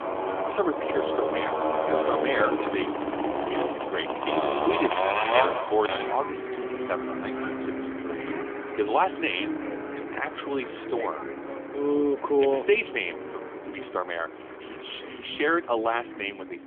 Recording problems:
phone-call audio; nothing above 3.5 kHz
traffic noise; loud; throughout; 1 dB below the speech

